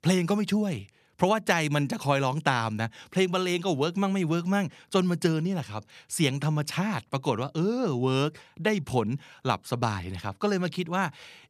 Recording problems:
none

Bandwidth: 14 kHz